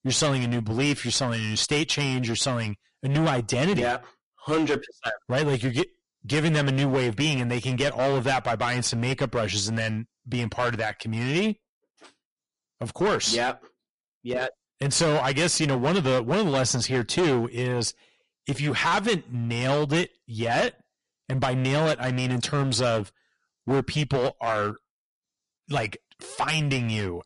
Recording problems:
distortion; heavy; 12% of the sound clipped
garbled, watery; slightly; nothing above 10.5 kHz

